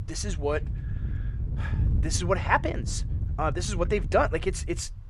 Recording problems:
wind noise on the microphone; occasional gusts; 20 dB below the speech

